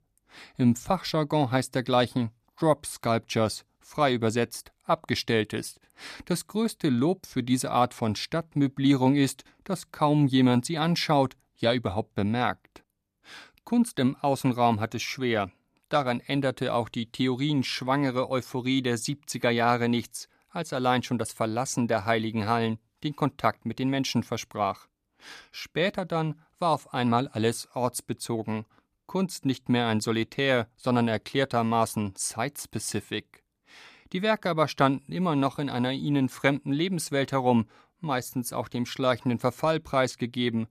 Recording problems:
none

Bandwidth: 14.5 kHz